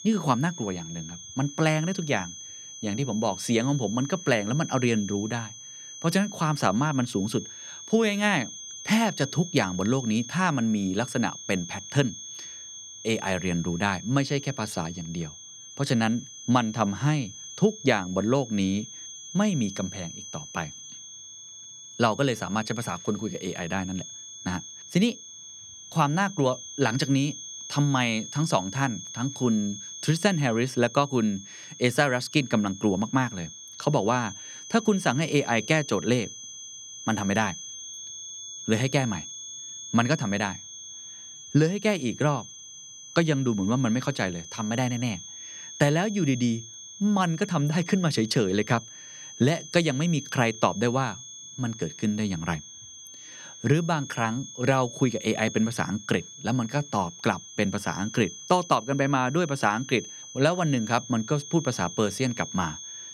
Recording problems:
high-pitched whine; noticeable; throughout; 6.5 kHz, 10 dB below the speech

